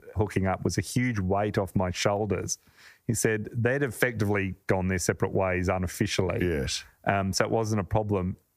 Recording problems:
squashed, flat; heavily

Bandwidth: 15 kHz